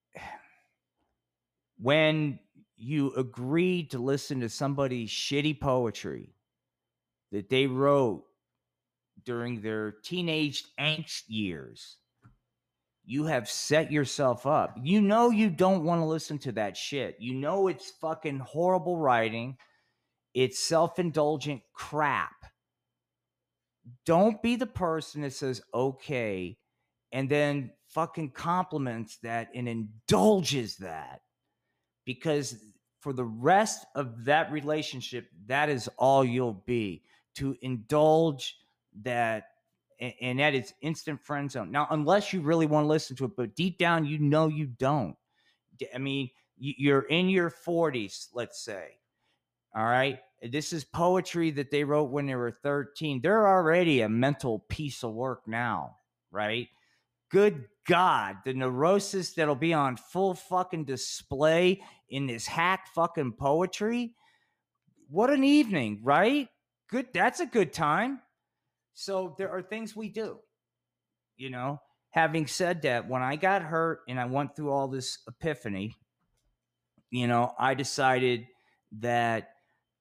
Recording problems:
none

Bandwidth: 15 kHz